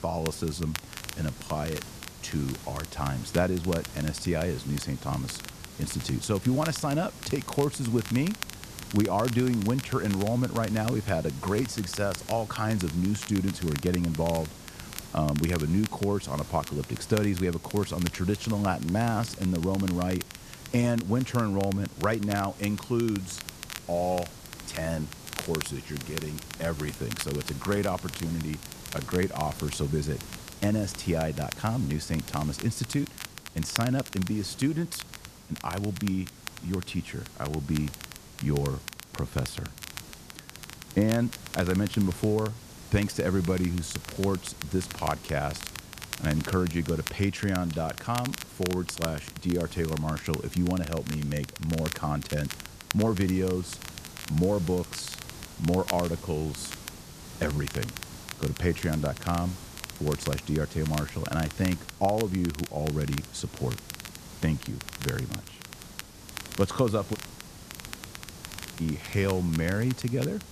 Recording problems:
hiss; noticeable; throughout; 15 dB below the speech
crackle, like an old record; noticeable; 10 dB below the speech
audio cutting out; at 1:07 for 1.5 s

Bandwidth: 14.5 kHz